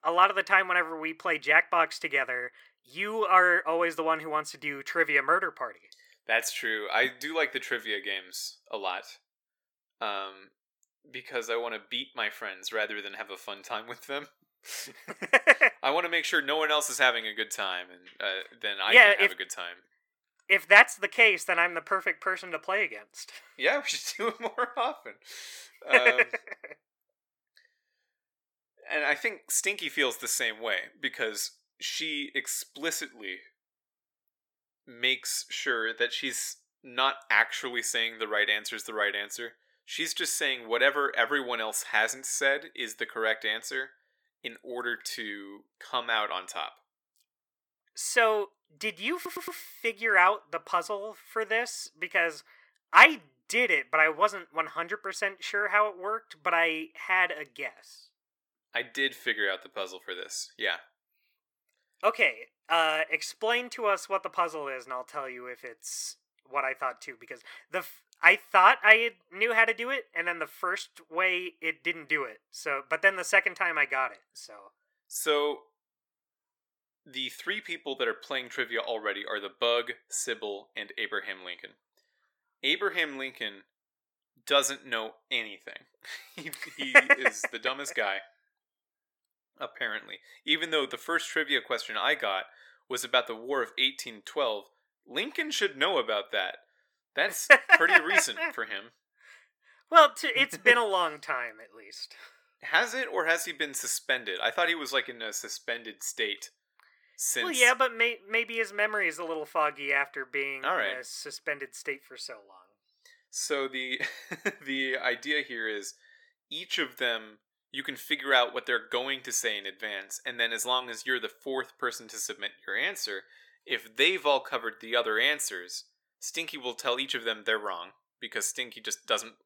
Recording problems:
thin; somewhat; fading below 450 Hz
audio stuttering; at 49 s

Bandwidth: 18 kHz